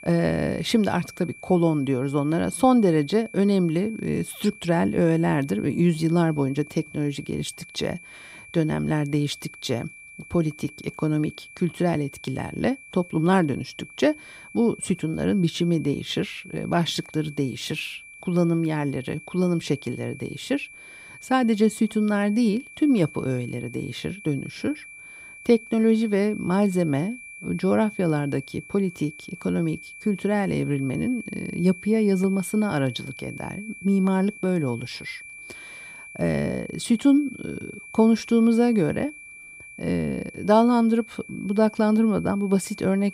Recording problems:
high-pitched whine; noticeable; throughout; 2.5 kHz, 15 dB below the speech

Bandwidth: 15.5 kHz